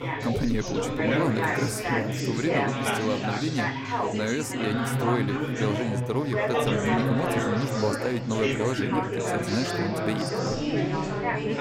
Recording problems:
chatter from many people; very loud; throughout; 2 dB above the speech

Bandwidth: 16 kHz